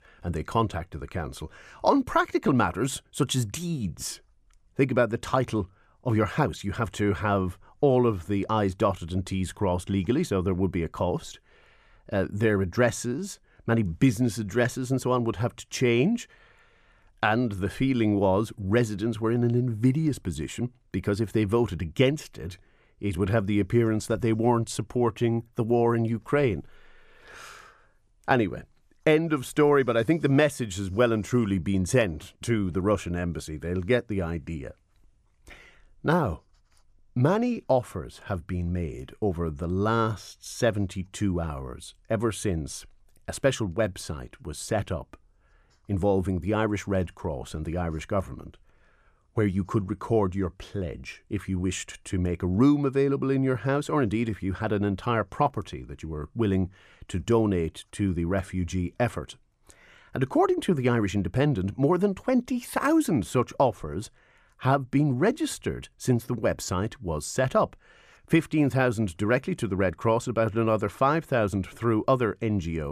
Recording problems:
abrupt cut into speech; at the end

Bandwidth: 14.5 kHz